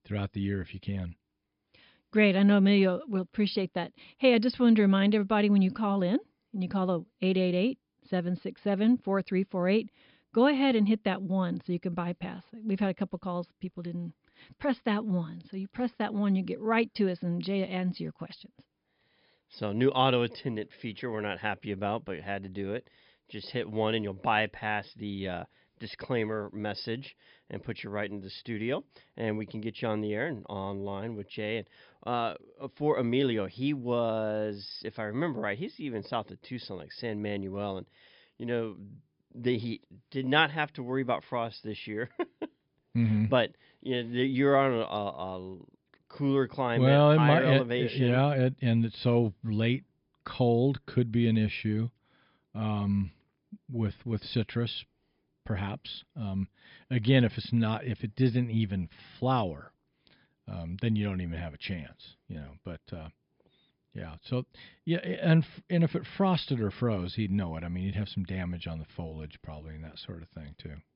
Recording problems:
high frequencies cut off; noticeable; nothing above 5.5 kHz

